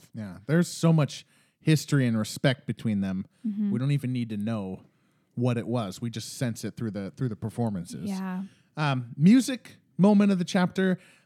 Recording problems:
none

